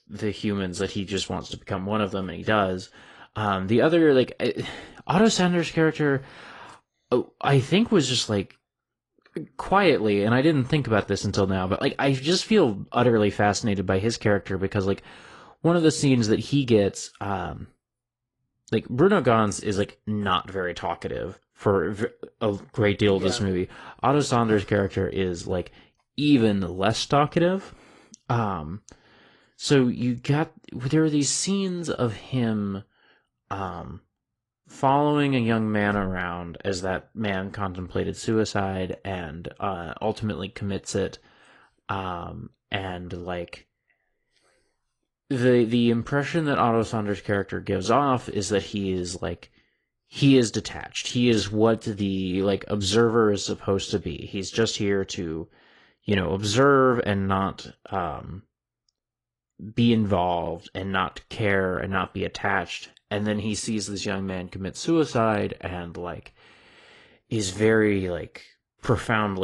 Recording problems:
garbled, watery; slightly
abrupt cut into speech; at the end

